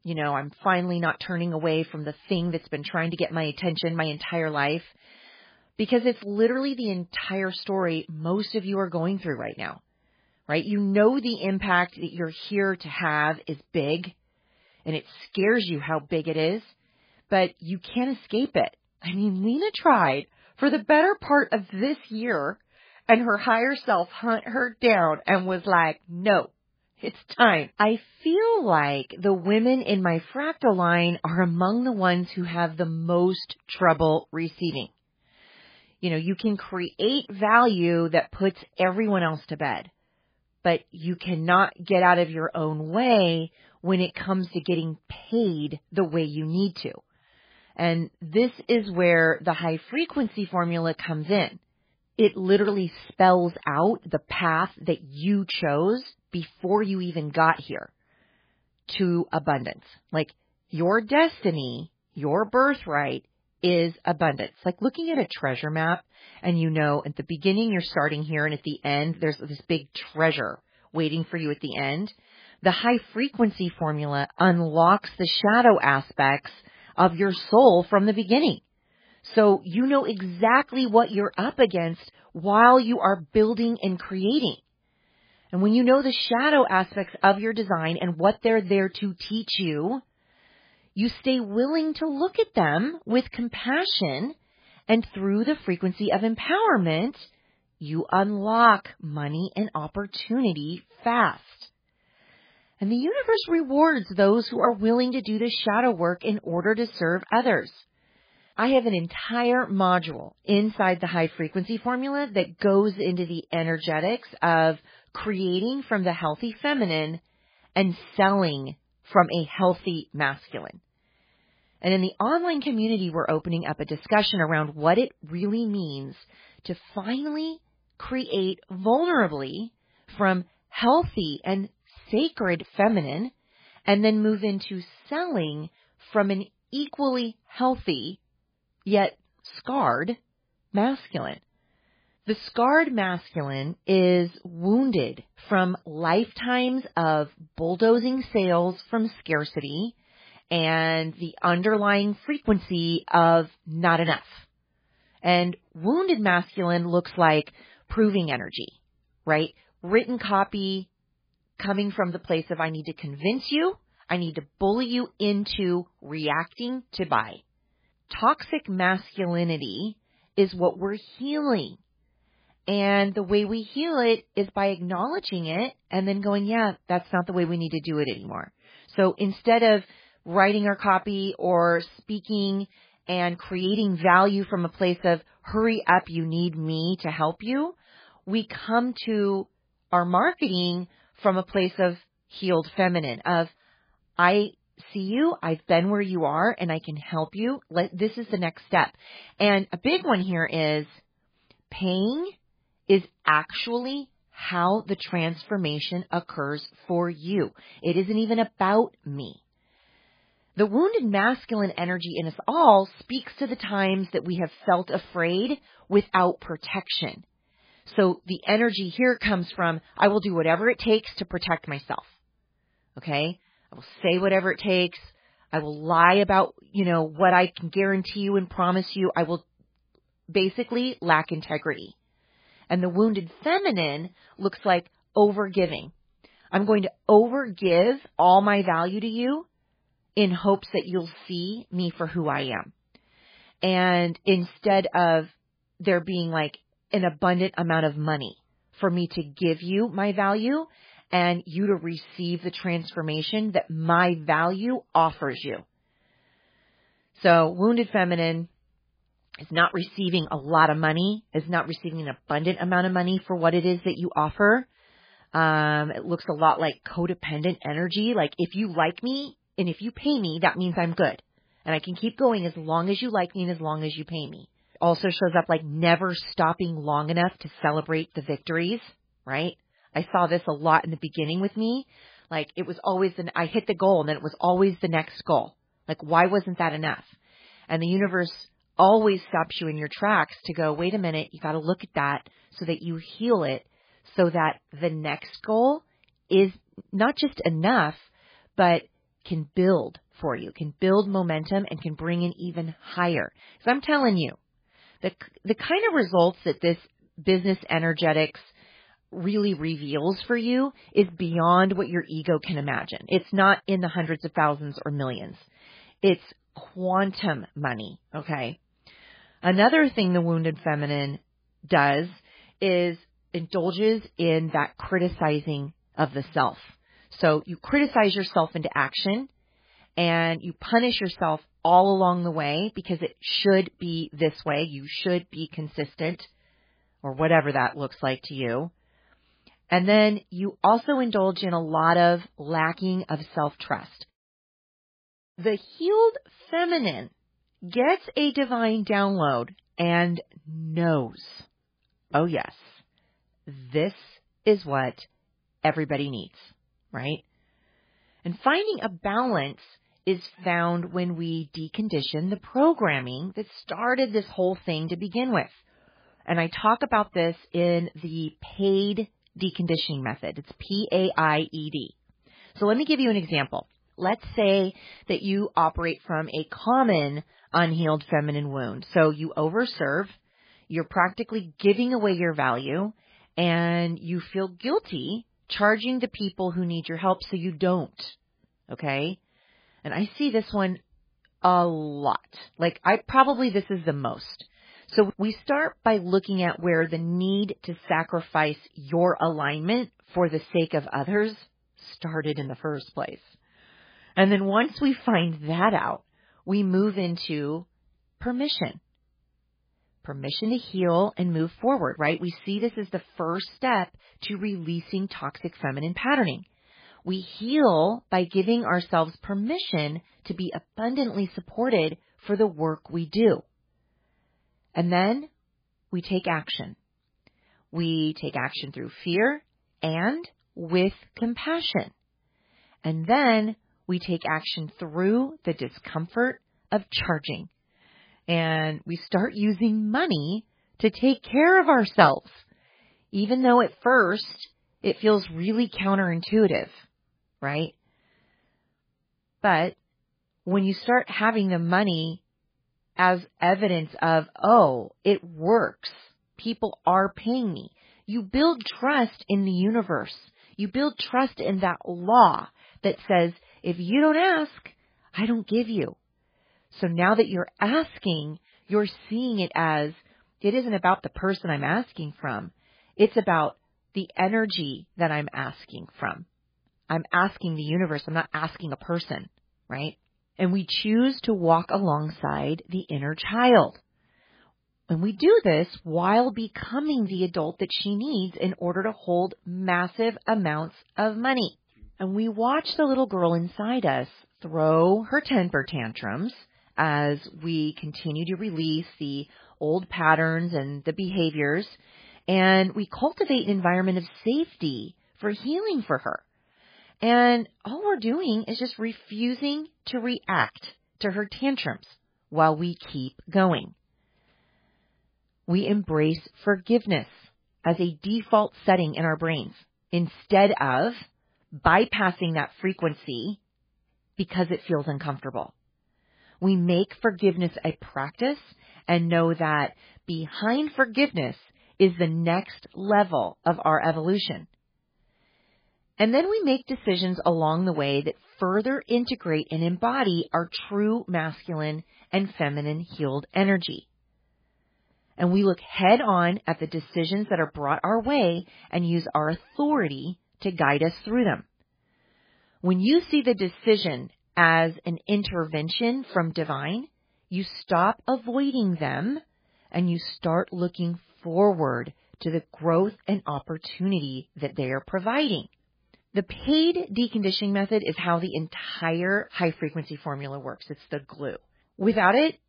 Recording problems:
garbled, watery; badly; nothing above 4.5 kHz

